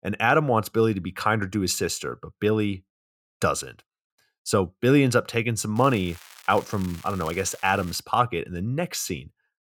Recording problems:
crackling; faint; from 6 to 8 s; 20 dB below the speech

